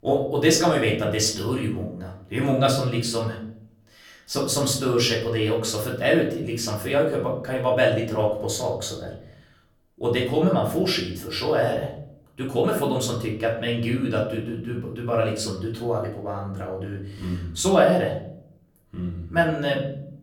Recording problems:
off-mic speech; far
room echo; slight; dies away in 0.6 s

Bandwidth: 18.5 kHz